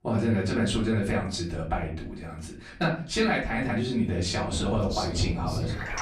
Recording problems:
off-mic speech; far
room echo; slight; dies away in 0.4 s
rain or running water; loud; from 4.5 s on; 6 dB below the speech

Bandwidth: 14.5 kHz